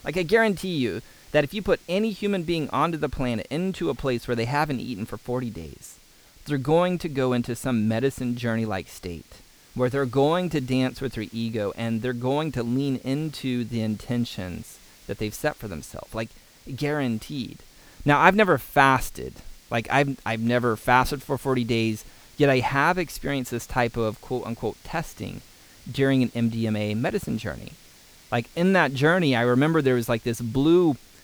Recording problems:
hiss; faint; throughout; 25 dB below the speech

